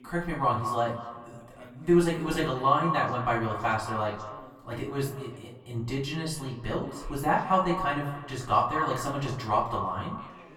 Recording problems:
echo of what is said; strong; throughout; 180 ms later, 8 dB below the speech
off-mic speech; far
room echo; slight; dies away in 0.4 s
background chatter; faint; throughout; 2 voices, 25 dB below the speech

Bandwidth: 17 kHz